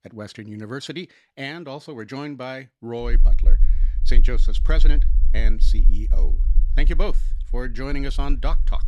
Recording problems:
low rumble; noticeable; from 3 s on; 15 dB below the speech

